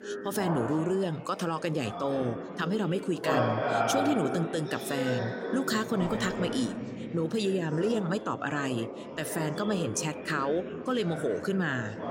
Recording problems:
chatter from many people; loud; throughout; 4 dB below the speech

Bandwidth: 16 kHz